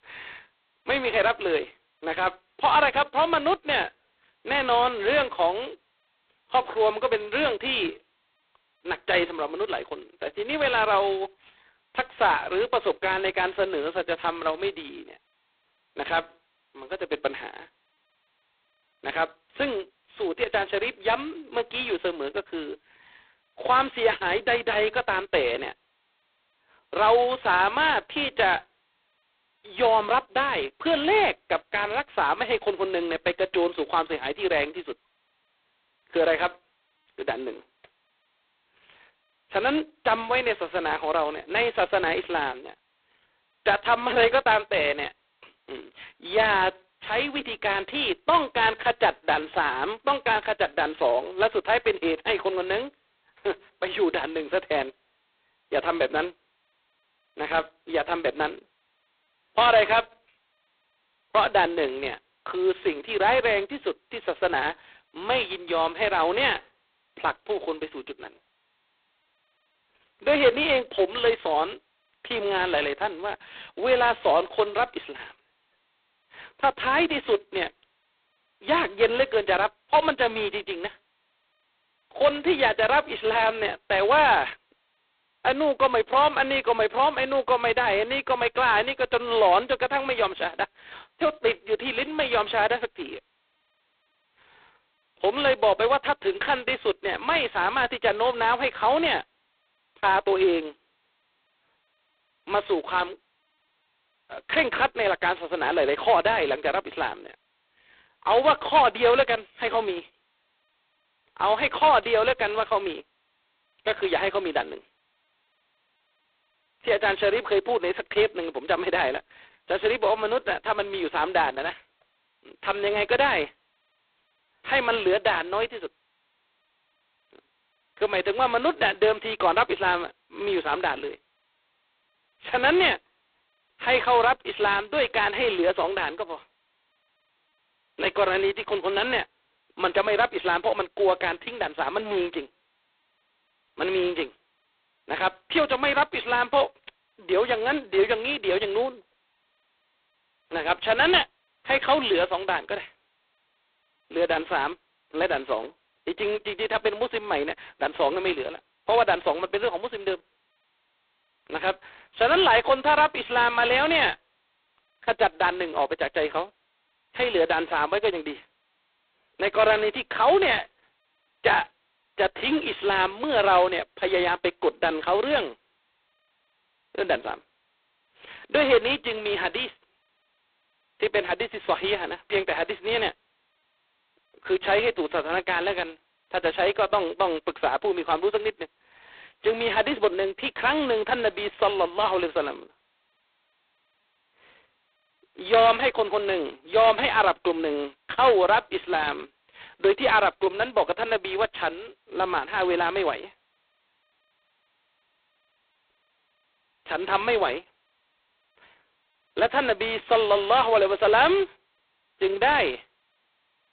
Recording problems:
phone-call audio; poor line; nothing above 4 kHz

